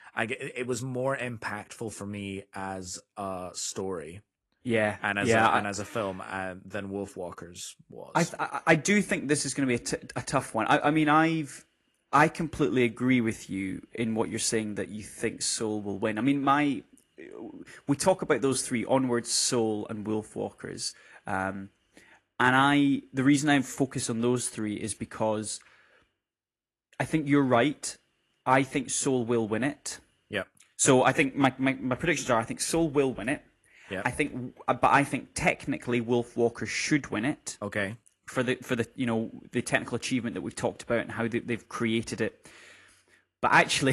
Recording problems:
garbled, watery; slightly
abrupt cut into speech; at the end

